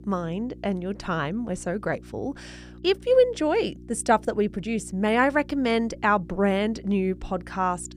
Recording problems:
electrical hum; faint; throughout; 60 Hz, 25 dB below the speech

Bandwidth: 15 kHz